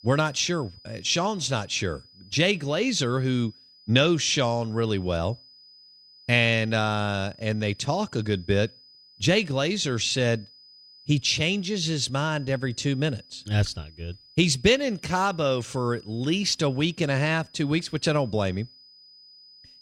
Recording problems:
high-pitched whine; faint; throughout; 5 kHz, 25 dB below the speech

